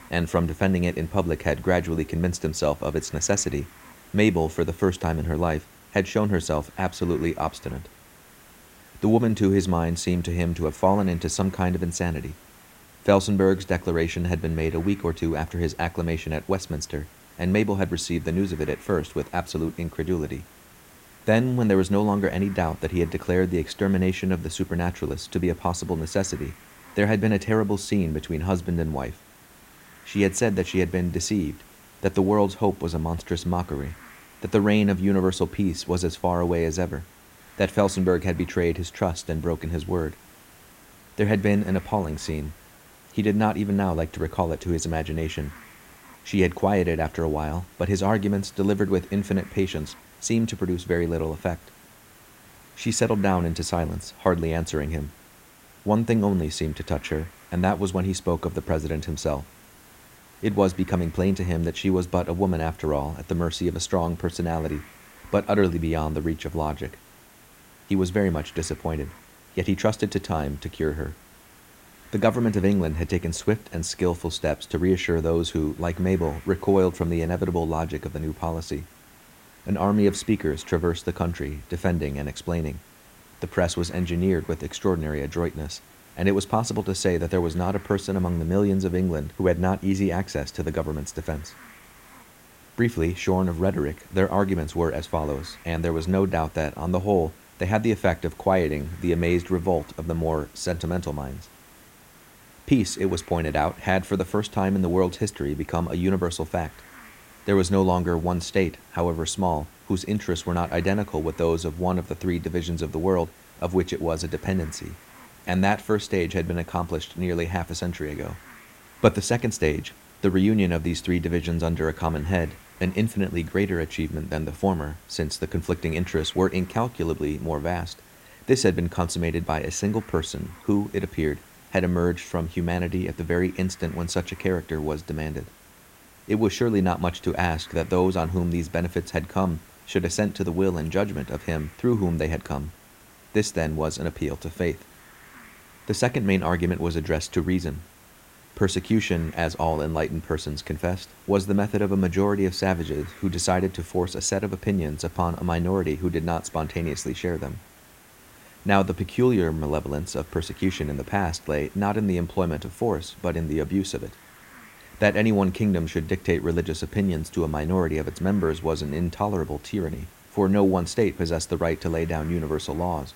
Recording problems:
hiss; faint; throughout; 25 dB below the speech

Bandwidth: 16 kHz